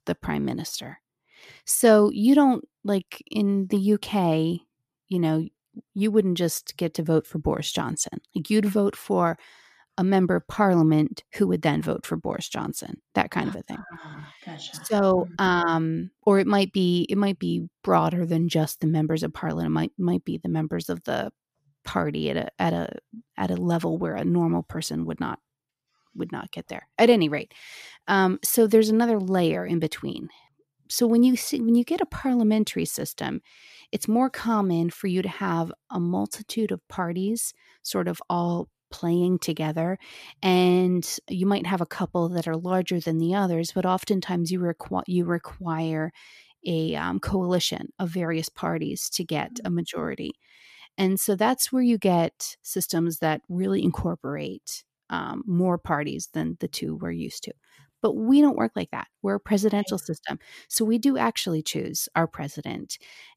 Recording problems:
none

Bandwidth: 14.5 kHz